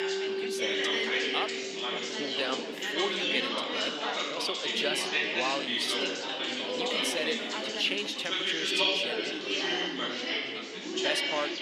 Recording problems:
thin; somewhat; fading below 300 Hz
chatter from many people; very loud; throughout; 5 dB above the speech
background music; loud; throughout; 6 dB below the speech

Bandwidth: 15.5 kHz